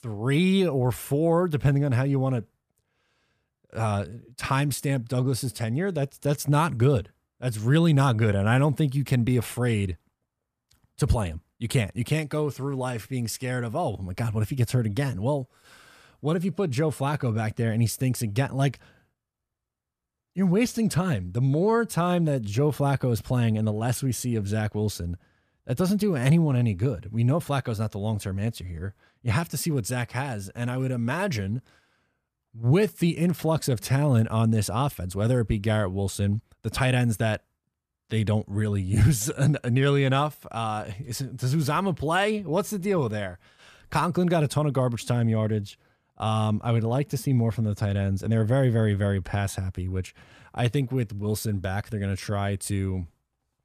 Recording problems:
none

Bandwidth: 14.5 kHz